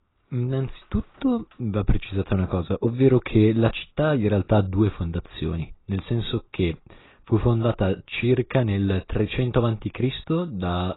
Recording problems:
garbled, watery; badly; nothing above 4 kHz

